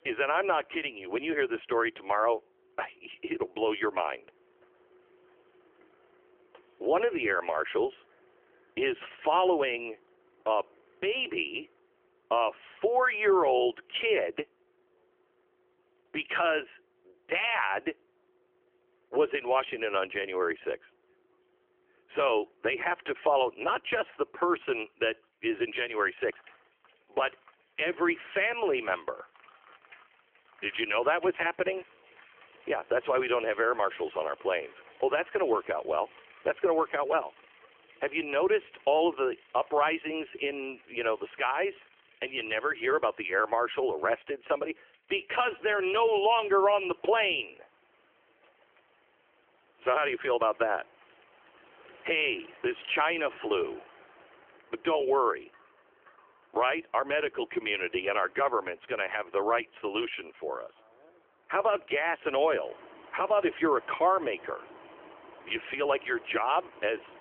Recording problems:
phone-call audio; nothing above 3 kHz
traffic noise; faint; throughout; 25 dB below the speech

